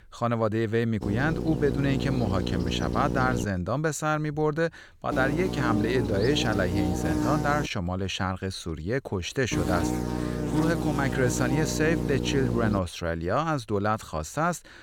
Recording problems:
electrical hum; loud; from 1 to 3.5 s, from 5 to 7.5 s and from 9.5 to 13 s; 60 Hz, 5 dB below the speech

